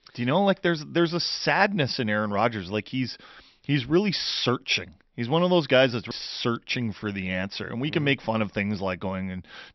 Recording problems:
high frequencies cut off; noticeable; nothing above 5.5 kHz

